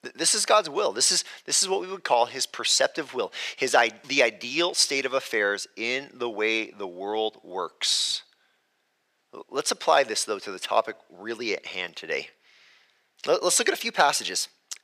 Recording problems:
thin; somewhat; fading below 500 Hz

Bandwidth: 15 kHz